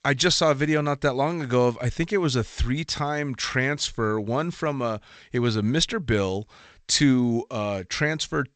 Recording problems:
garbled, watery; slightly; nothing above 8 kHz

